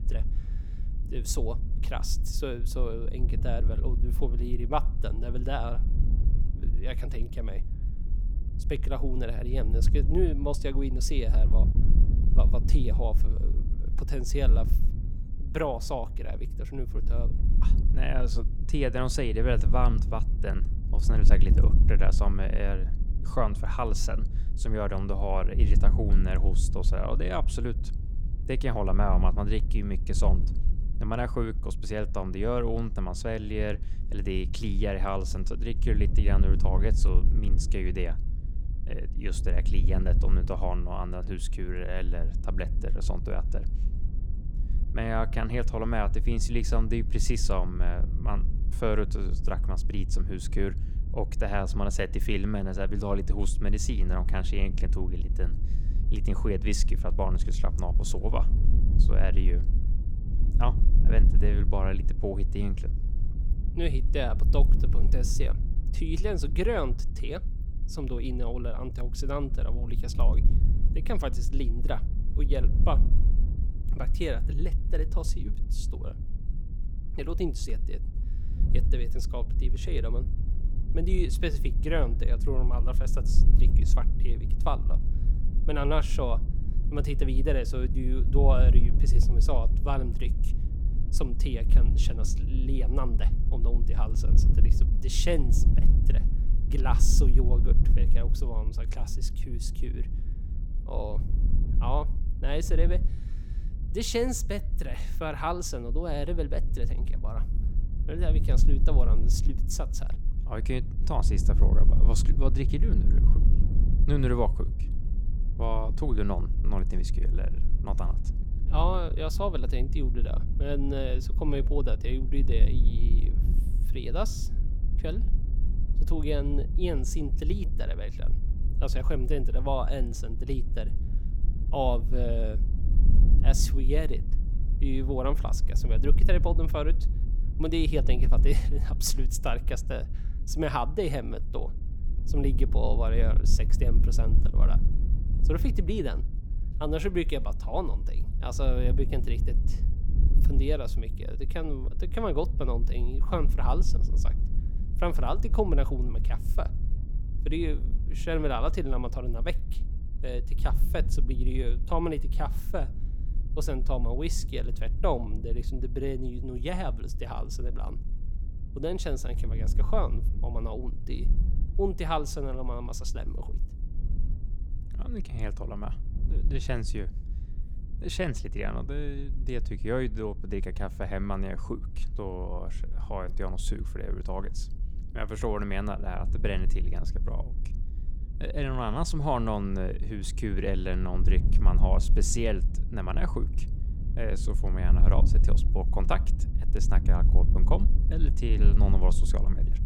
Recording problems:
wind noise on the microphone; occasional gusts; 10 dB below the speech

